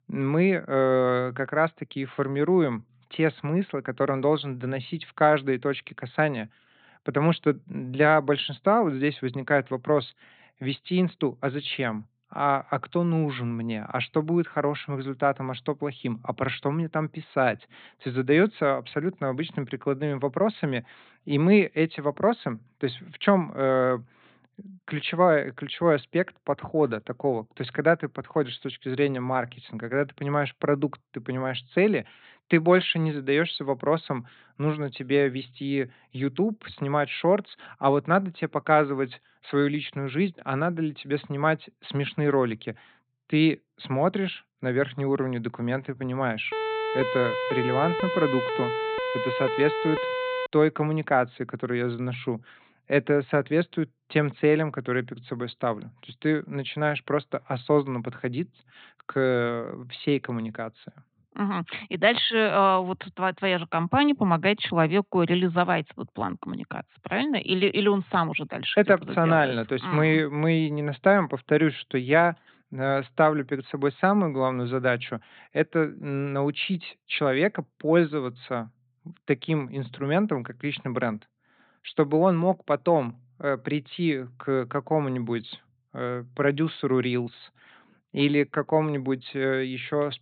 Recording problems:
high frequencies cut off; severe; nothing above 4 kHz
siren; noticeable; from 47 to 50 s; peak 2 dB below the speech

